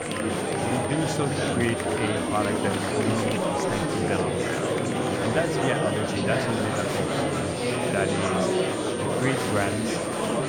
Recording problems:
murmuring crowd; very loud; throughout; 4 dB above the speech
high-pitched whine; loud; throughout; 9 kHz, 9 dB below the speech

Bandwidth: 18 kHz